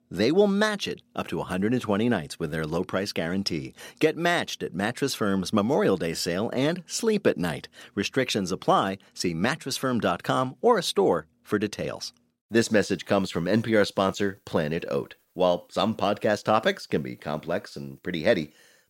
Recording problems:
none

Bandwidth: 16 kHz